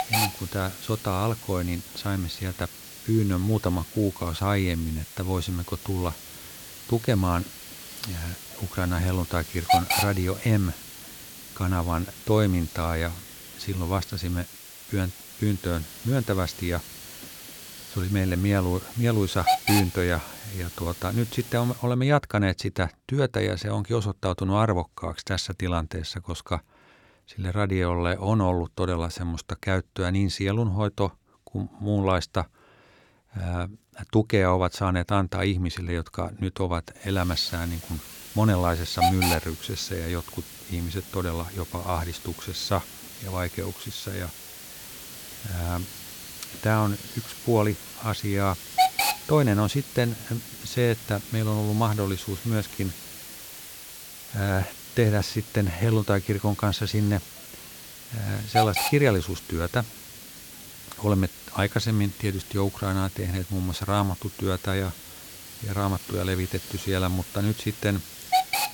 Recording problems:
hiss; loud; until 22 s and from 37 s on; 7 dB below the speech

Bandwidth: 18 kHz